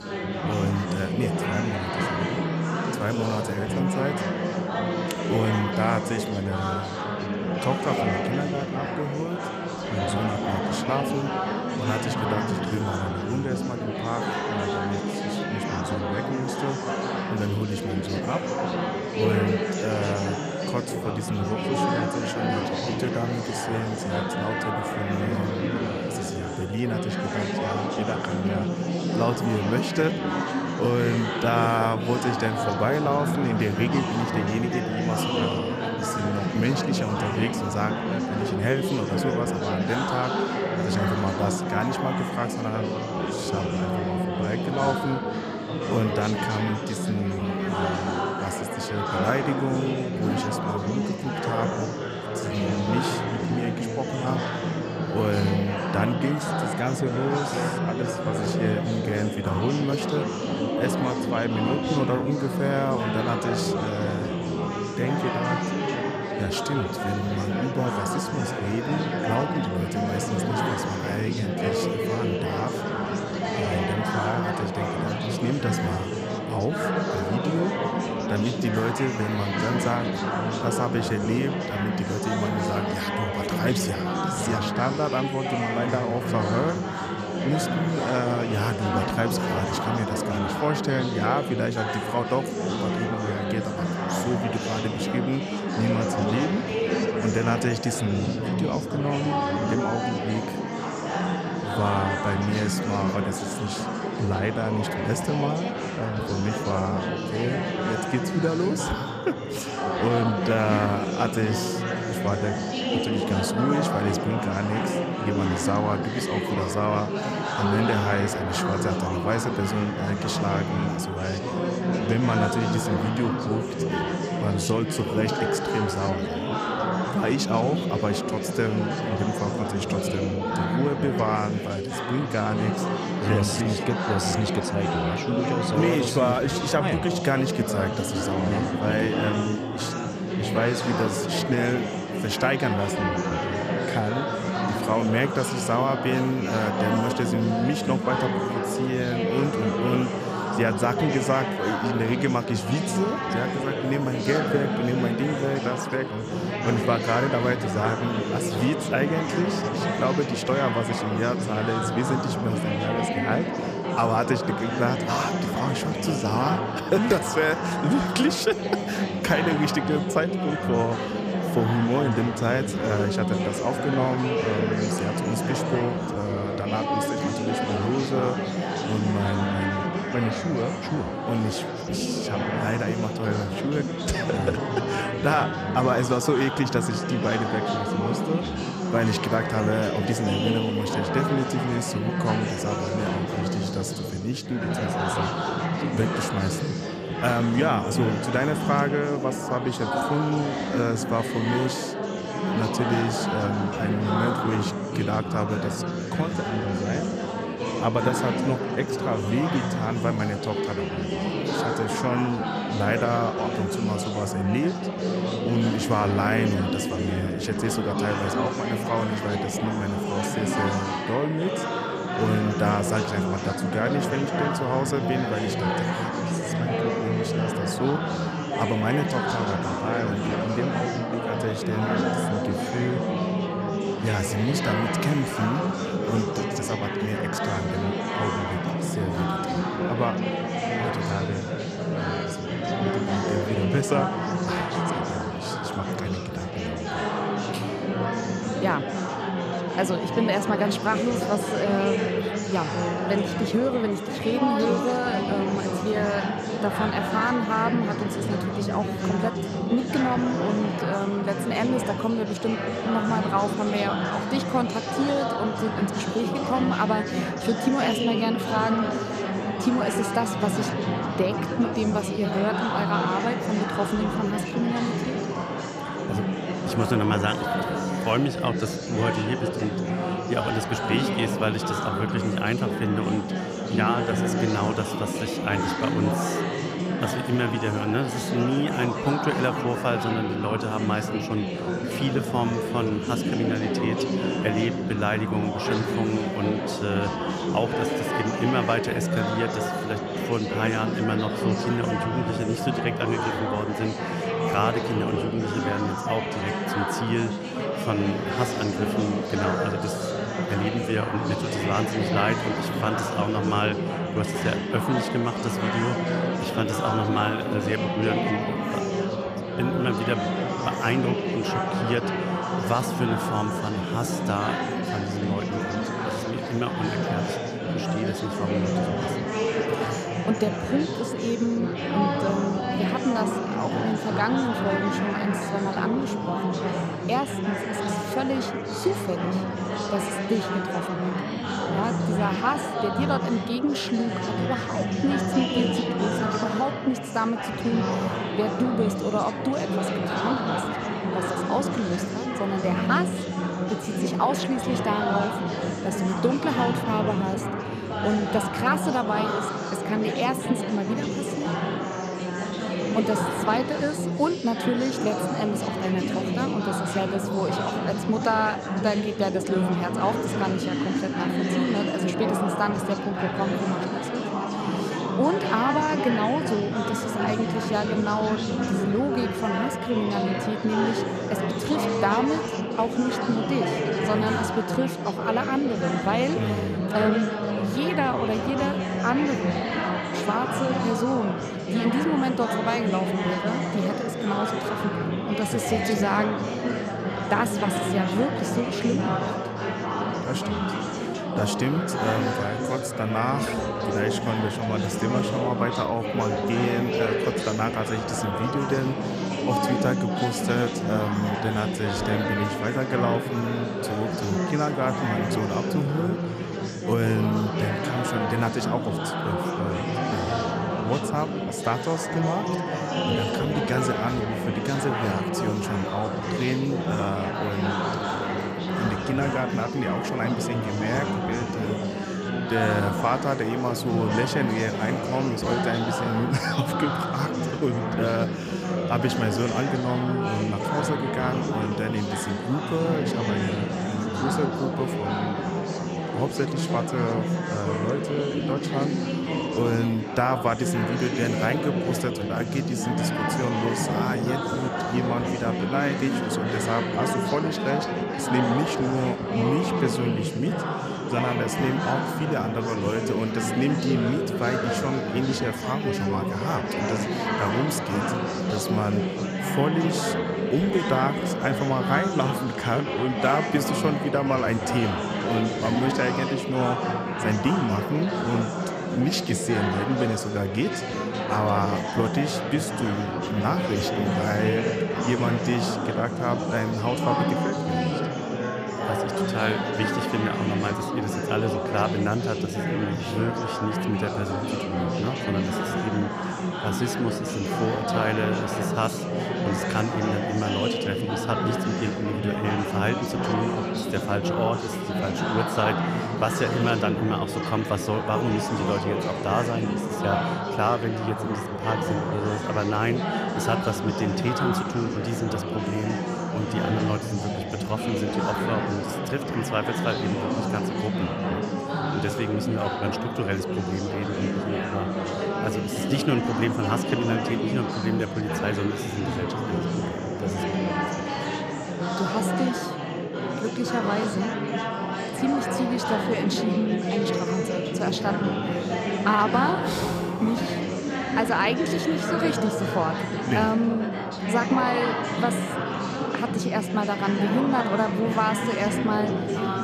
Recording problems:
chatter from many people; very loud; throughout; 1 dB above the speech

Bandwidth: 14.5 kHz